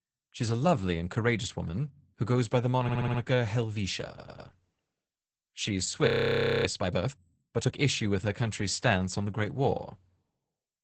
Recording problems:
garbled, watery; badly; nothing above 8 kHz
audio stuttering; at 3 s and at 4 s
audio freezing; at 6 s for 0.5 s

